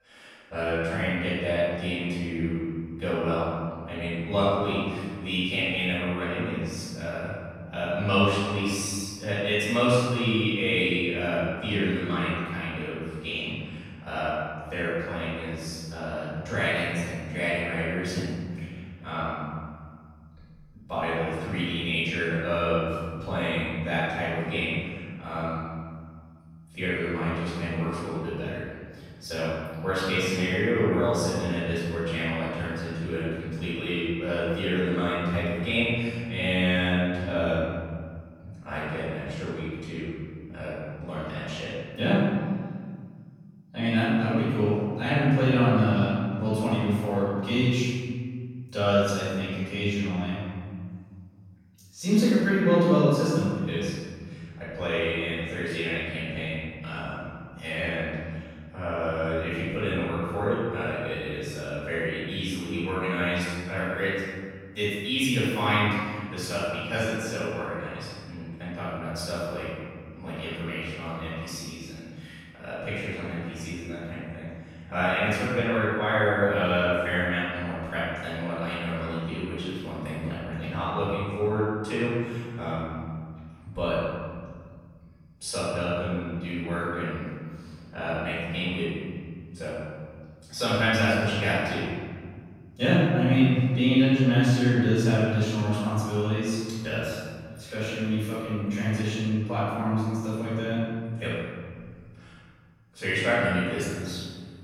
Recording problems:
room echo; strong; dies away in 2 s
off-mic speech; far

